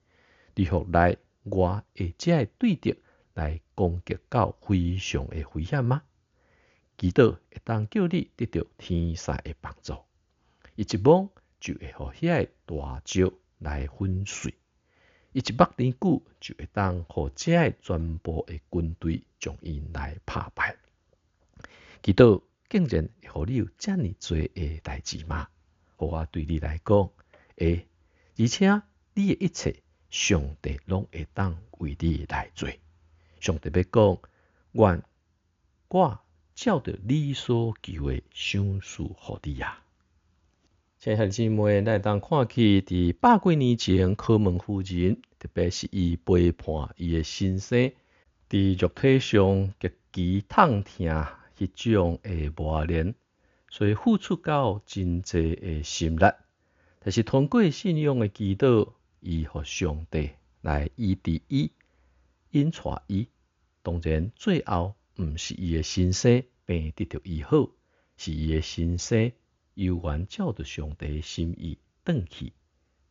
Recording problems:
high frequencies cut off; noticeable; nothing above 7 kHz

